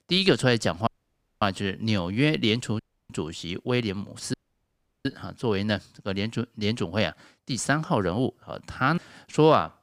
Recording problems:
audio cutting out; at 1 s for 0.5 s, at 3 s and at 4.5 s for 0.5 s

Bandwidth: 15 kHz